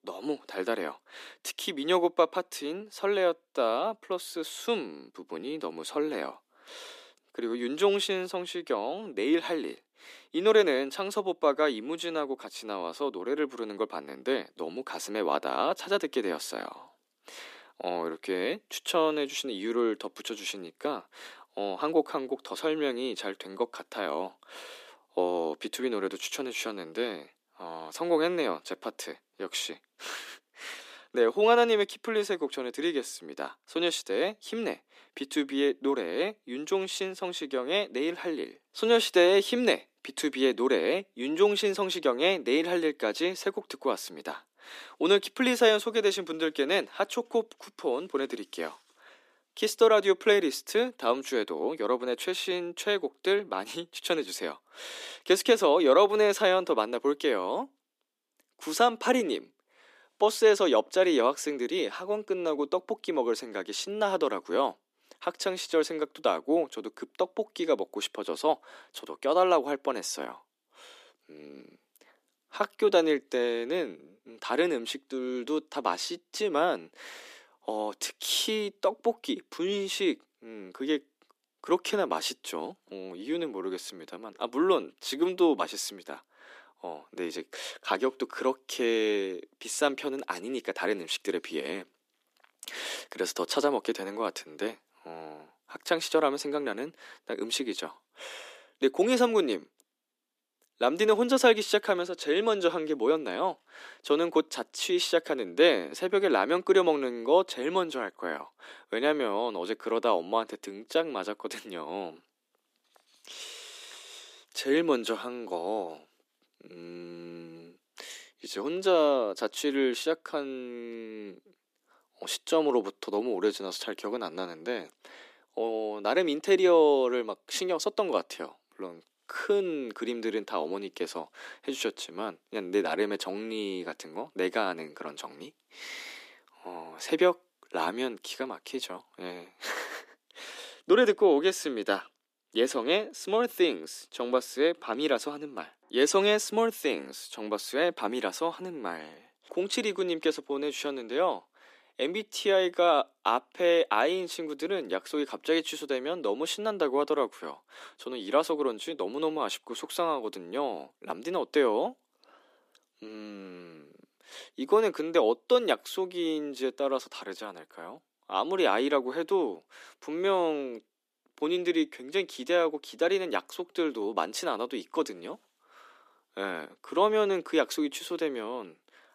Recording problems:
thin; somewhat; fading below 300 Hz

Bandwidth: 14.5 kHz